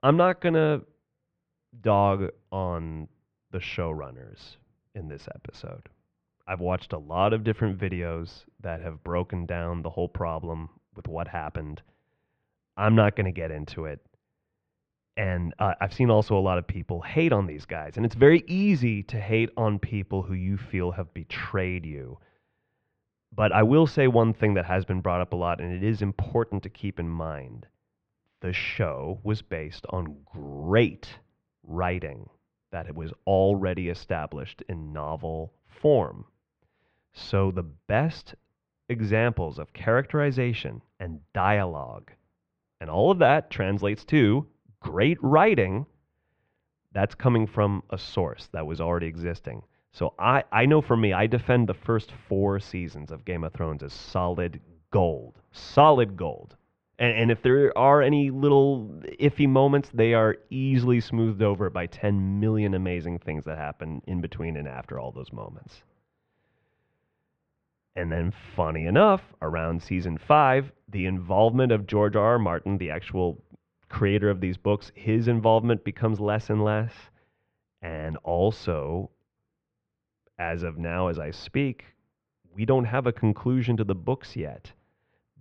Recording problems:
muffled; very; fading above 2.5 kHz

